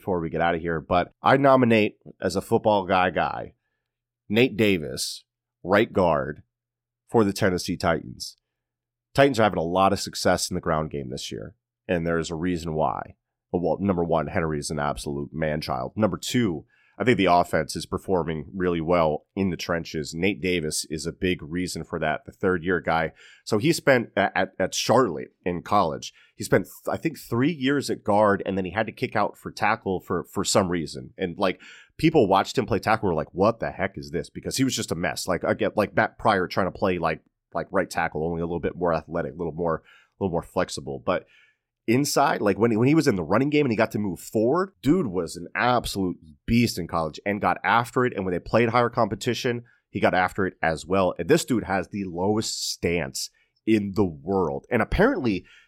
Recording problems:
none

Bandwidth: 16.5 kHz